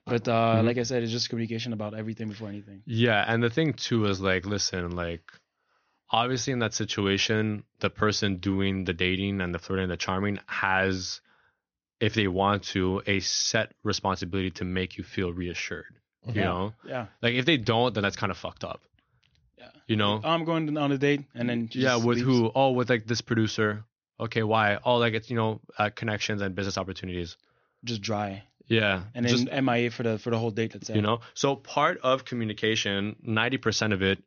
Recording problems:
high frequencies cut off; noticeable; nothing above 6.5 kHz

